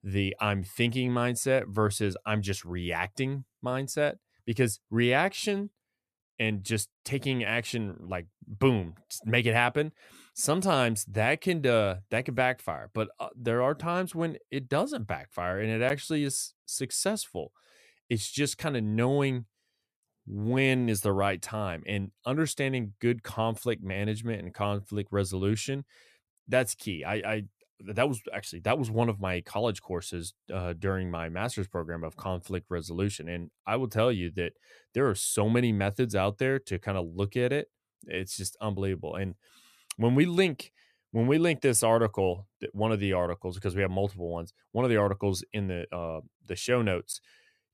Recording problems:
none

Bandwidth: 14.5 kHz